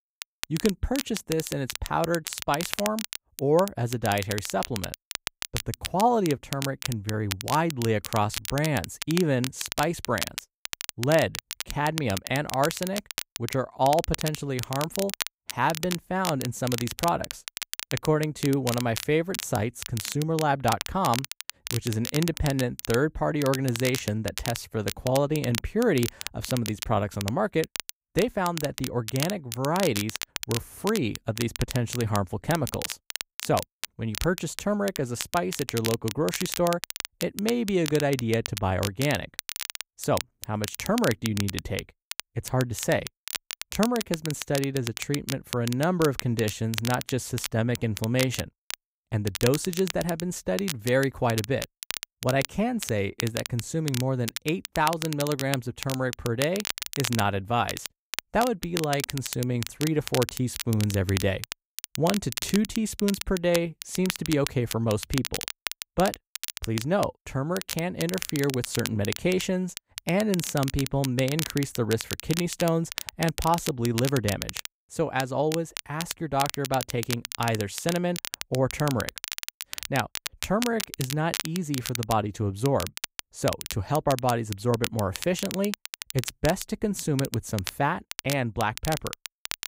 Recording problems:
crackle, like an old record; loud; 7 dB below the speech

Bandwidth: 15.5 kHz